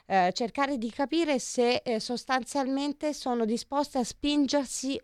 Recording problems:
none

